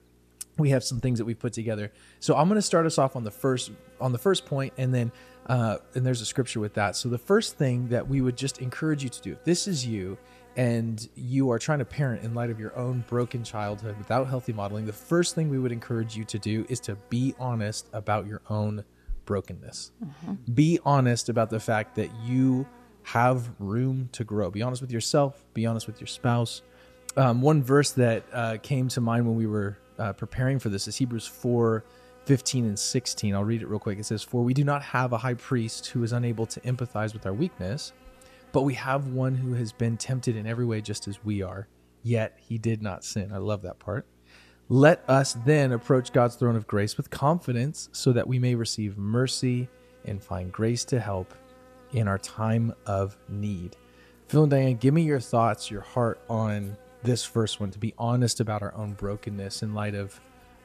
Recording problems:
electrical hum; faint; throughout; 60 Hz, 25 dB below the speech

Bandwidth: 14.5 kHz